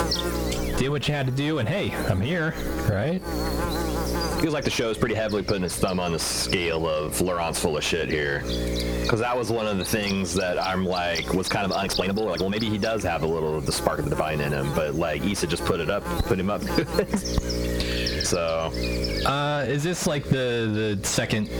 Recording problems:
distortion; slight; 10 dB below the speech
squashed, flat; somewhat
electrical hum; loud; throughout; 60 Hz, 7 dB below the speech
uneven, jittery; strongly; from 0.5 to 21 s

